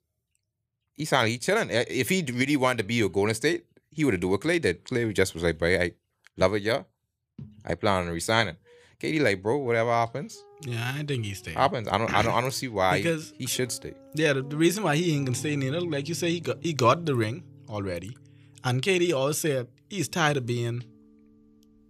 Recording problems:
background music; faint; from 8.5 s on; 20 dB below the speech

